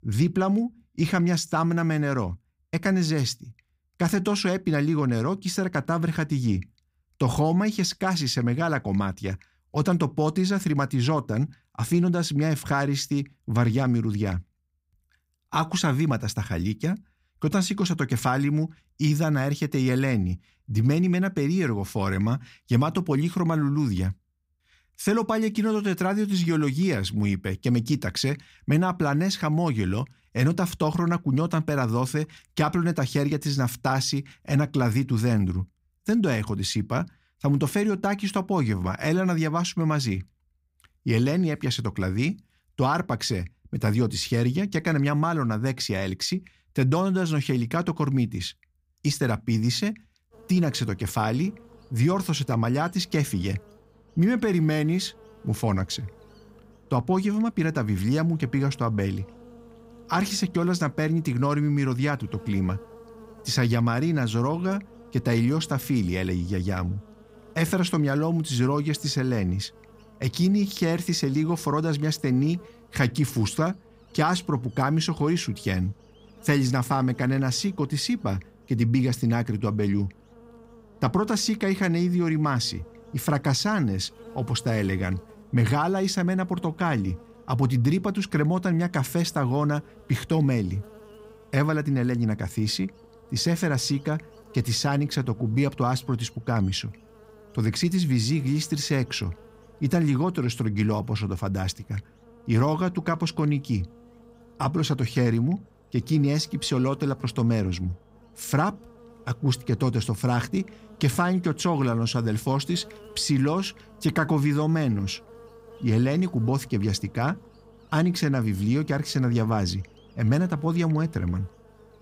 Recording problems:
electrical hum; faint; from 50 s on; 50 Hz, 25 dB below the speech

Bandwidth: 15.5 kHz